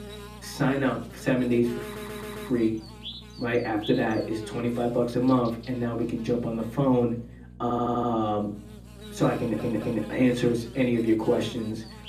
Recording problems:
off-mic speech; far
room echo; slight; dies away in 0.5 s
electrical hum; noticeable; throughout; 60 Hz, 15 dB below the speech
audio stuttering; at 2 s, at 7.5 s and at 9.5 s

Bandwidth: 14.5 kHz